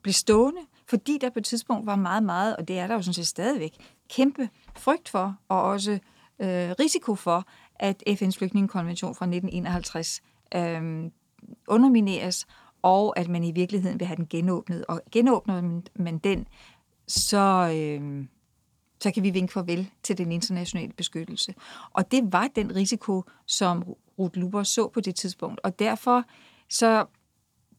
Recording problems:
none

